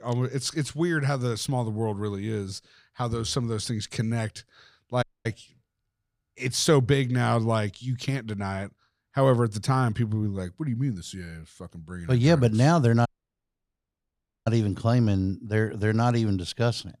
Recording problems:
audio cutting out; at 5 s and at 13 s for 1.5 s

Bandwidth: 15 kHz